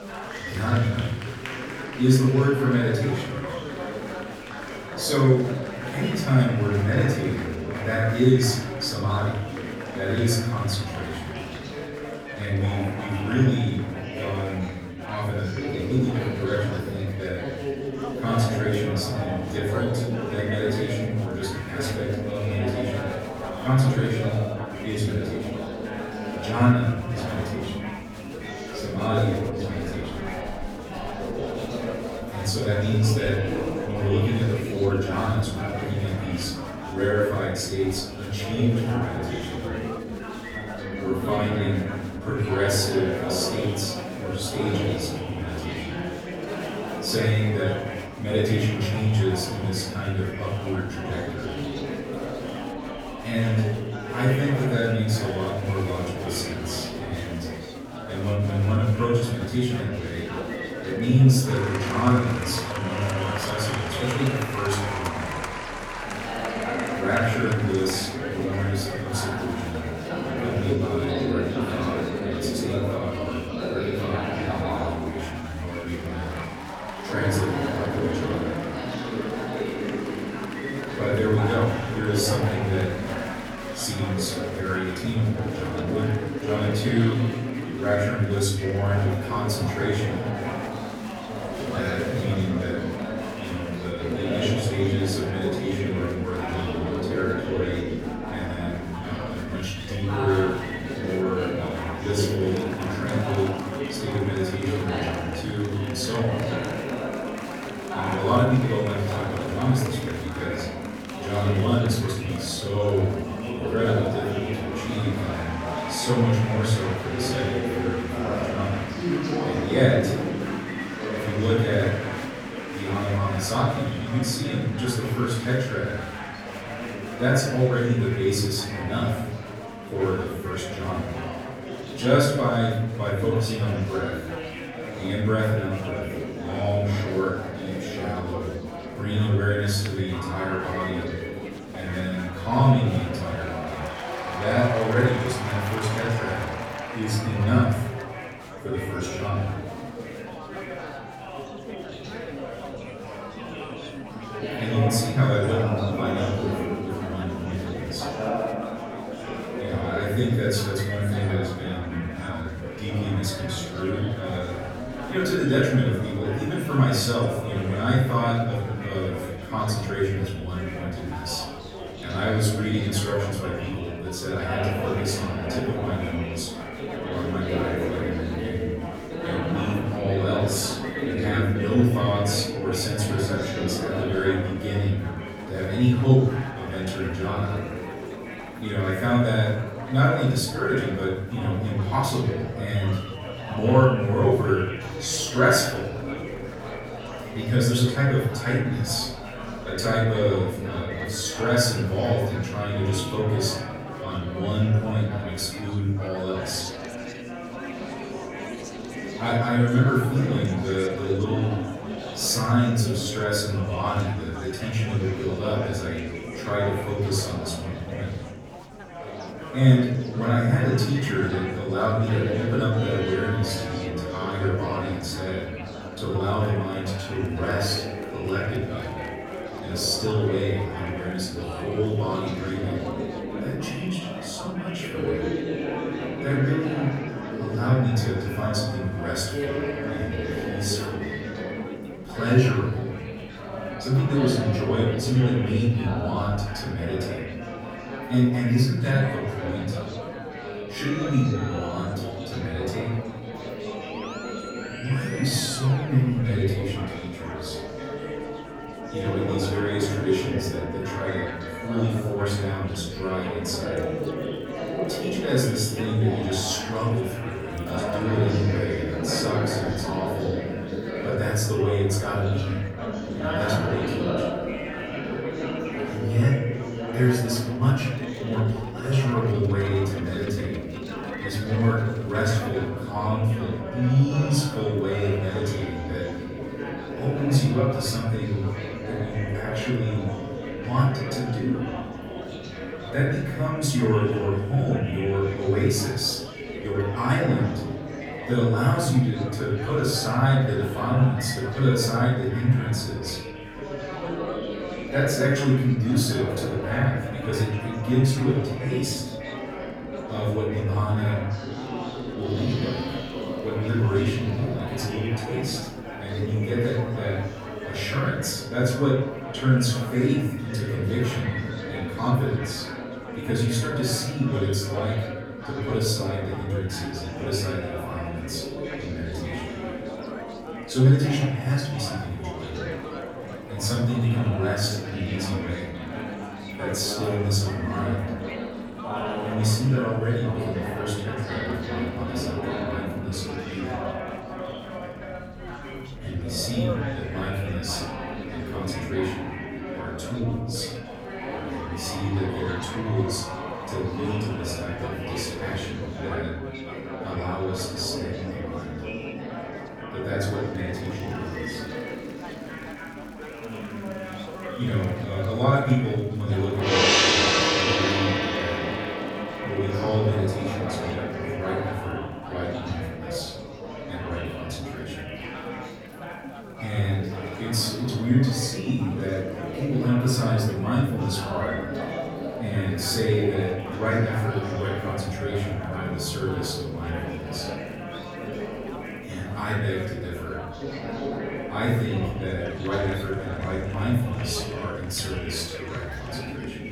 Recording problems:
off-mic speech; far
room echo; noticeable; dies away in 0.9 s
background music; loud; from 3:13 on; 10 dB below the speech
chatter from many people; loud; throughout; 6 dB below the speech

